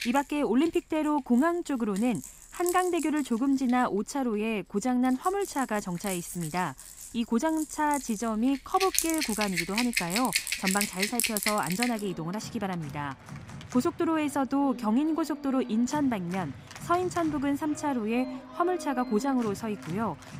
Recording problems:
background music; loud; throughout; 6 dB below the speech

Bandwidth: 15.5 kHz